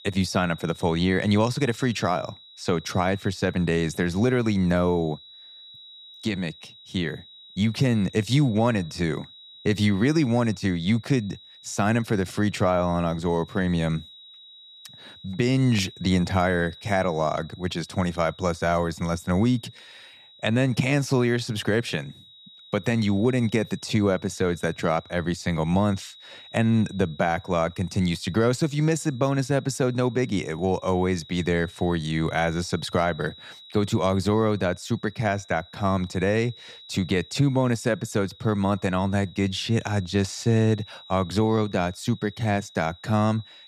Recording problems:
high-pitched whine; faint; throughout; 4 kHz, 20 dB below the speech

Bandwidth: 15 kHz